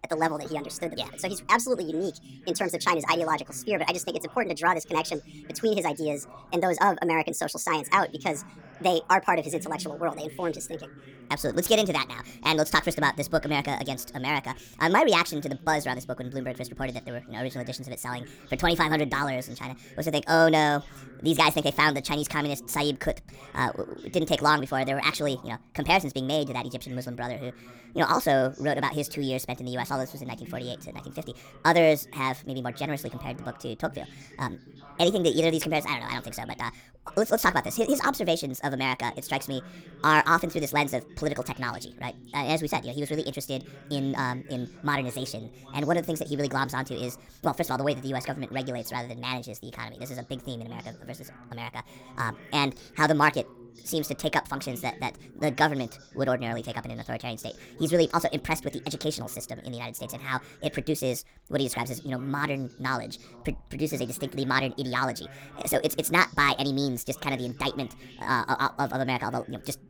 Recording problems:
wrong speed and pitch; too fast and too high; 1.5 times normal speed
voice in the background; faint; throughout; 20 dB below the speech

